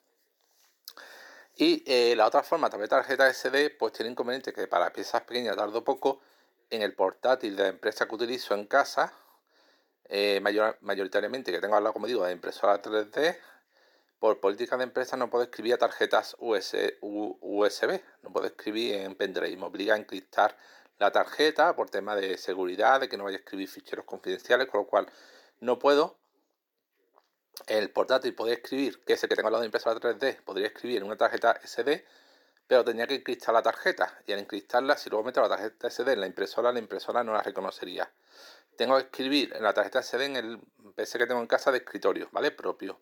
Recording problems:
thin; somewhat; fading below 350 Hz
uneven, jittery; strongly; from 5.5 to 40 s

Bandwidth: 18.5 kHz